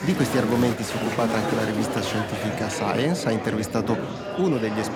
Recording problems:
murmuring crowd; loud; throughout; 3 dB below the speech

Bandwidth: 17 kHz